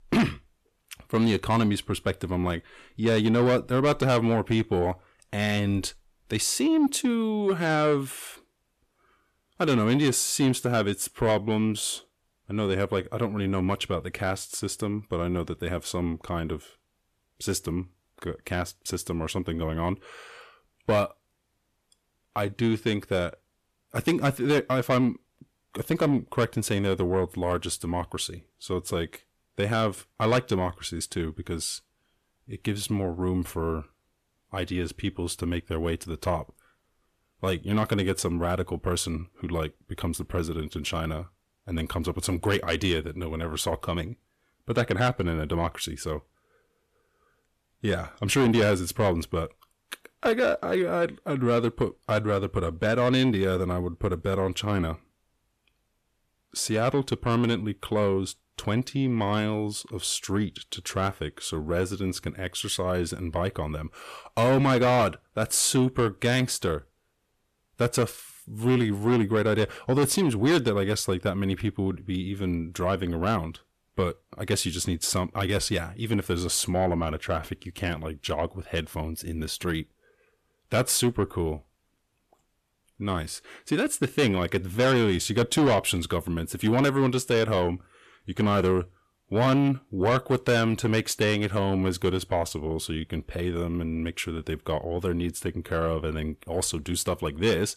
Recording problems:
distortion; slight; 10 dB below the speech

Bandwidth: 14 kHz